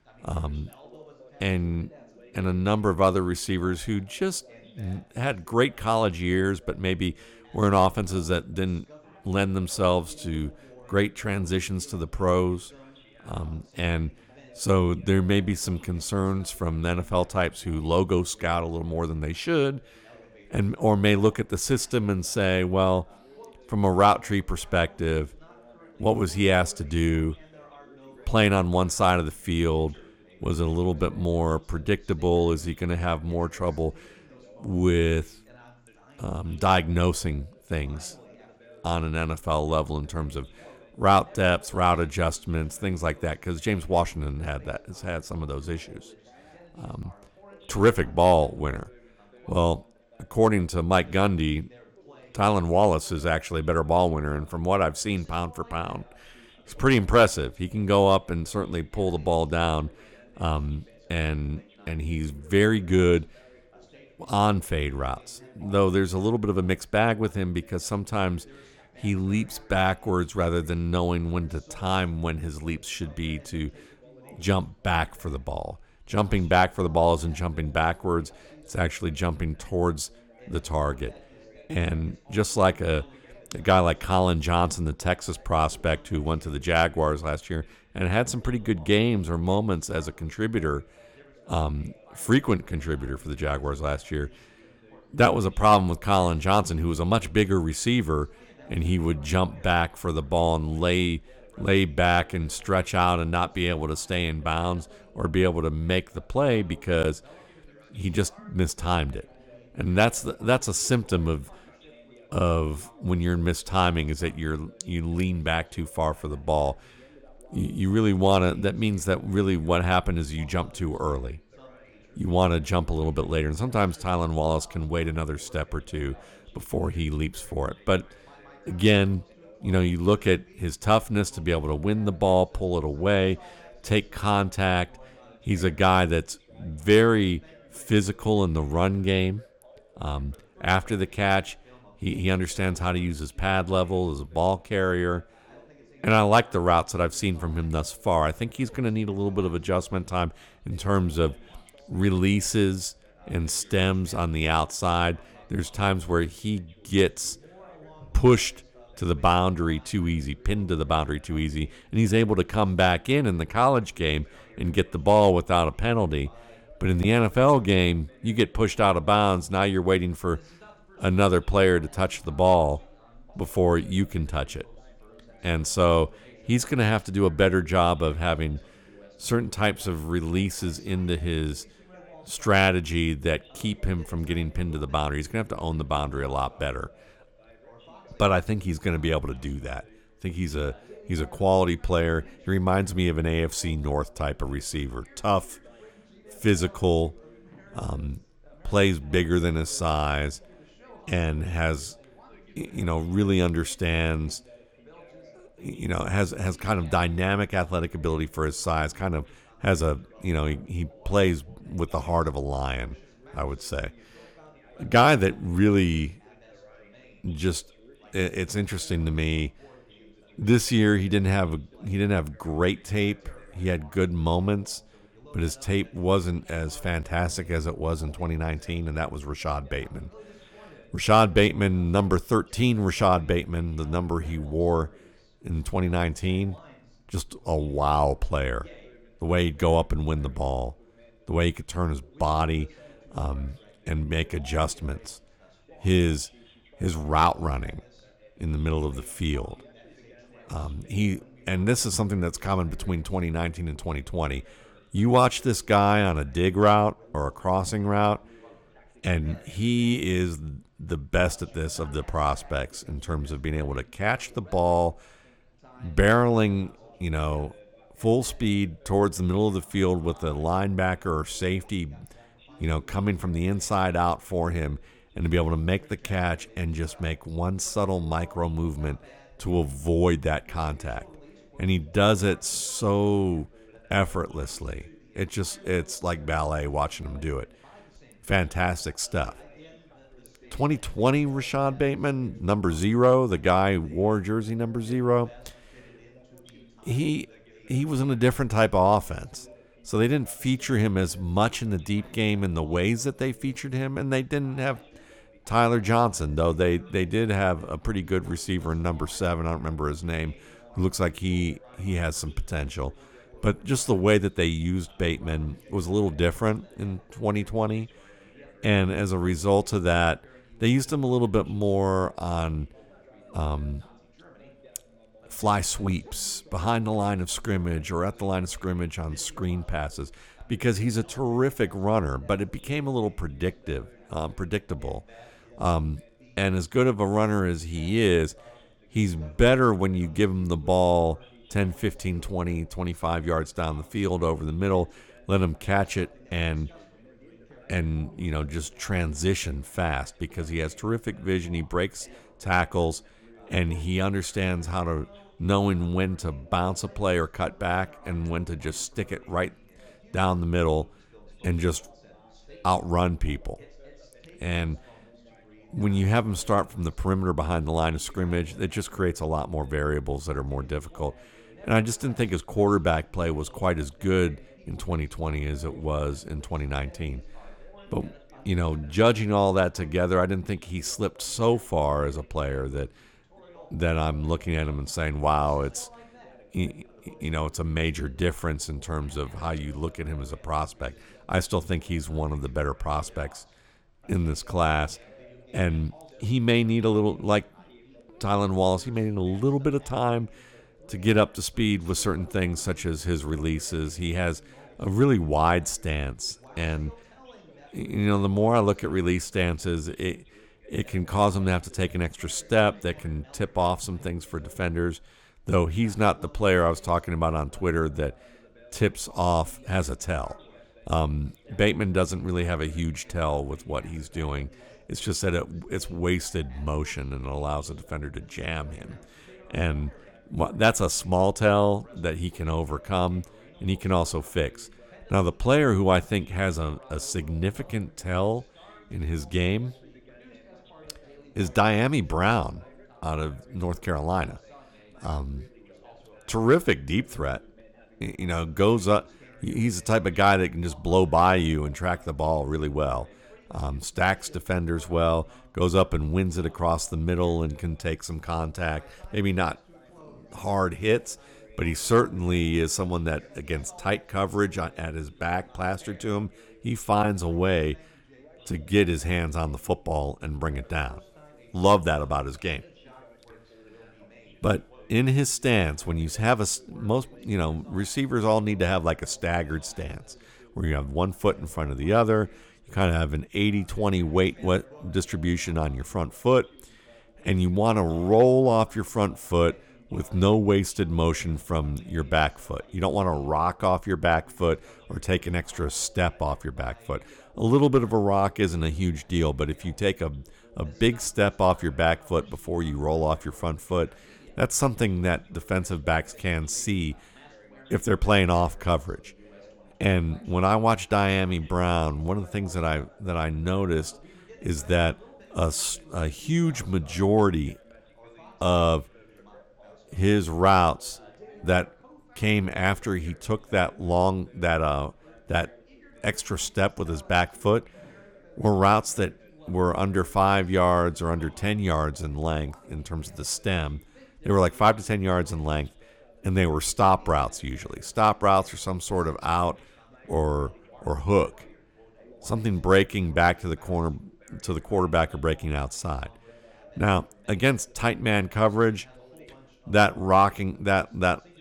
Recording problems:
background chatter; faint; throughout; 2 voices, 25 dB below the speech

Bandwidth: 18.5 kHz